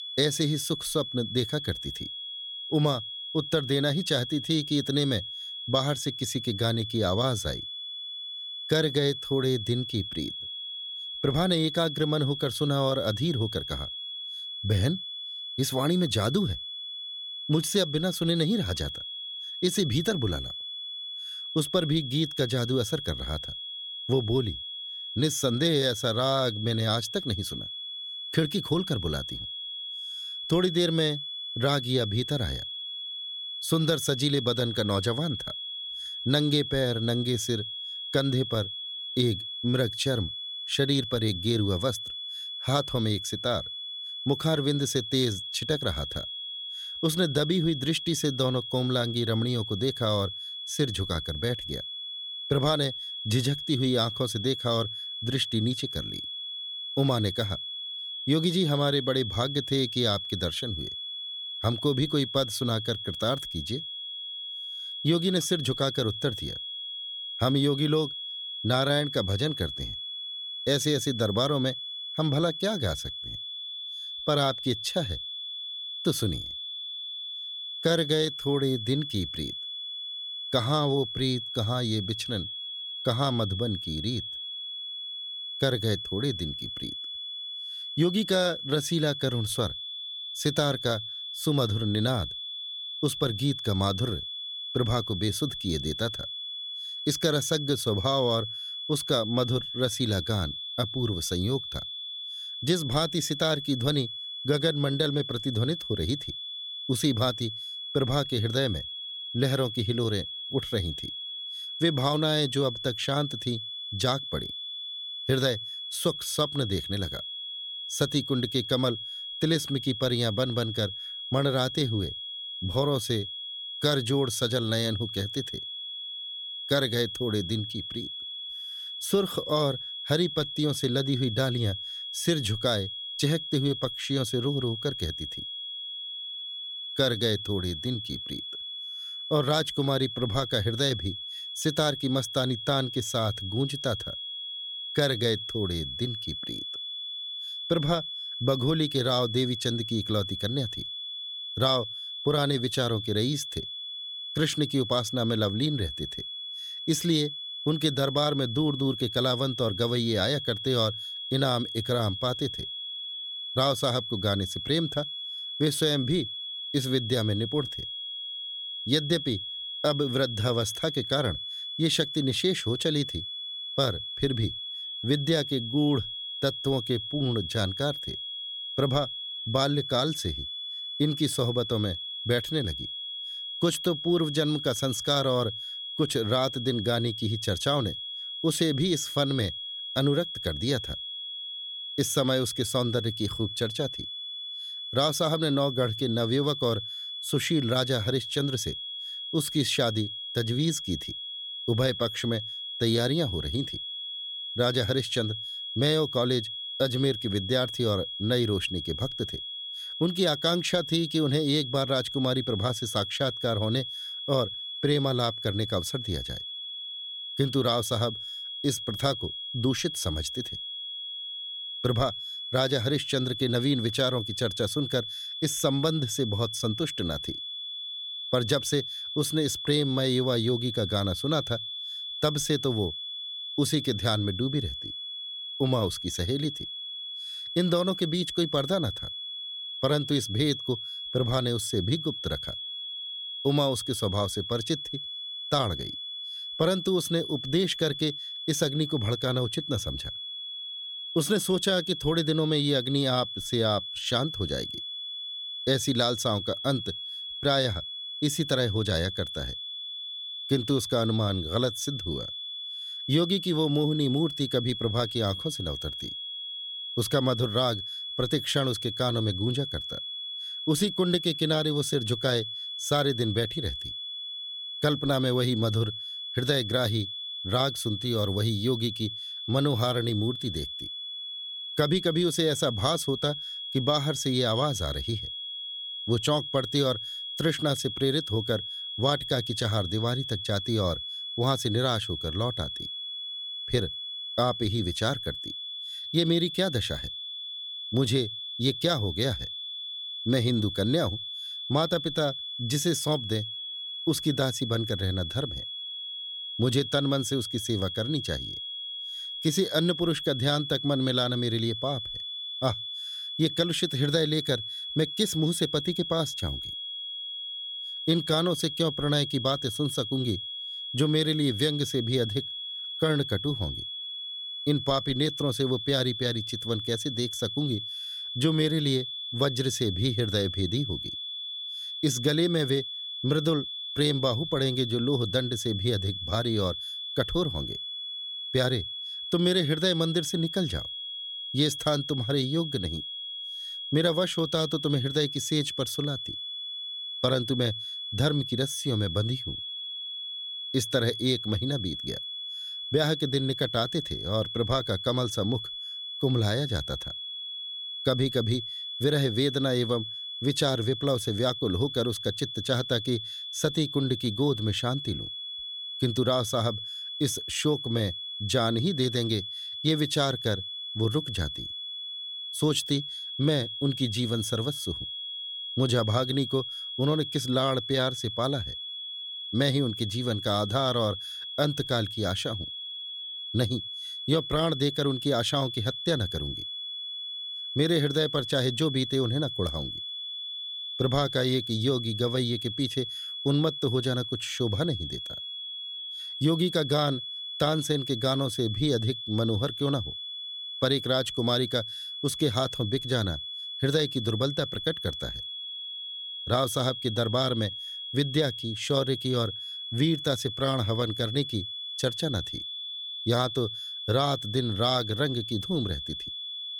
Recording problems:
high-pitched whine; loud; throughout; 3.5 kHz, 6 dB below the speech

